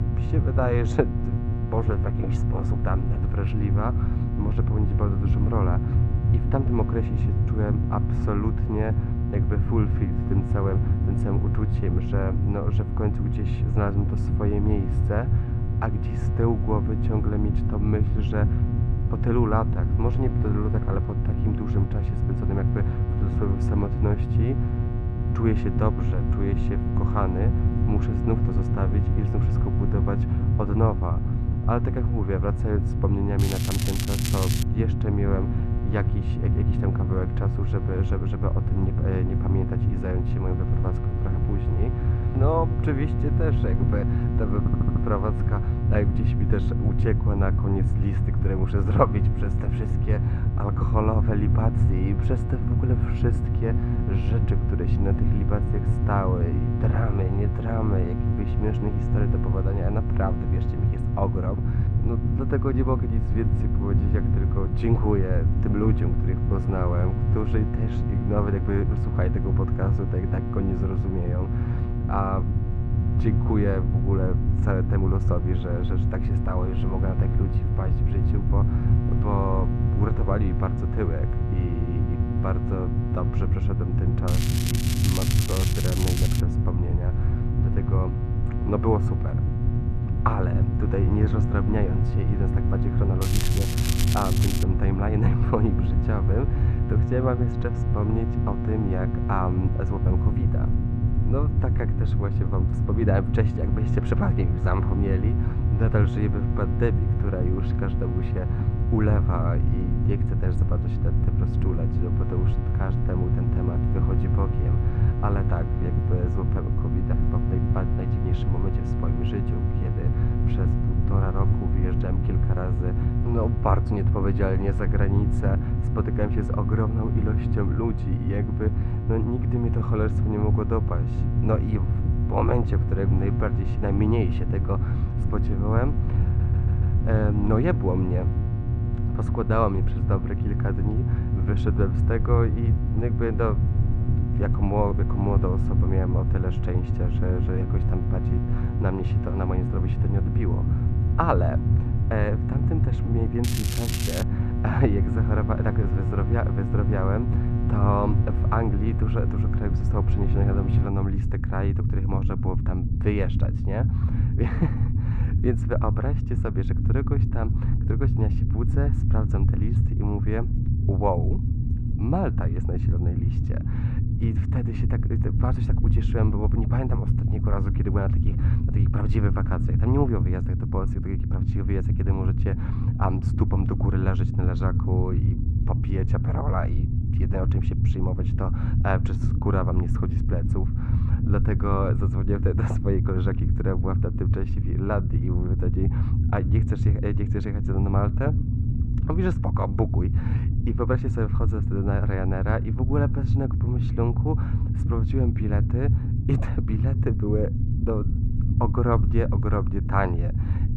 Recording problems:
muffled; very; fading above 1.5 kHz
electrical hum; loud; until 2:41; 60 Hz, 8 dB below the speech
low rumble; loud; throughout; 5 dB below the speech
crackling; loud; 4 times, first at 33 s; 3 dB below the speech
audio stuttering; at 45 s and at 2:16

